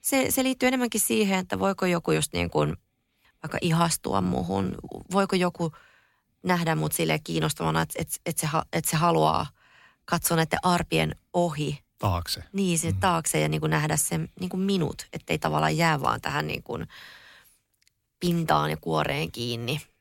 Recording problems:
none

